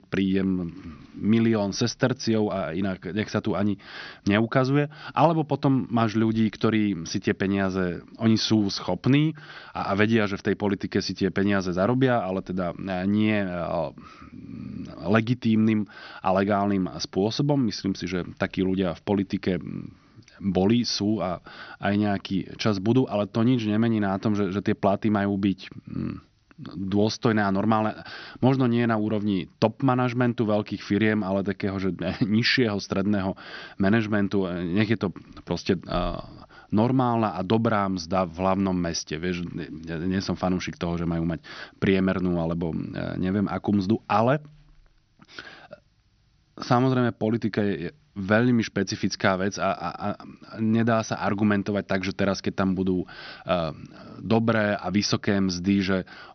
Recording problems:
high frequencies cut off; noticeable; nothing above 6 kHz

